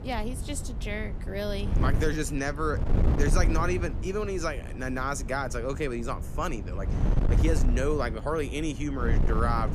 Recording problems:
wind noise on the microphone; heavy; 9 dB below the speech

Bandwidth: 14.5 kHz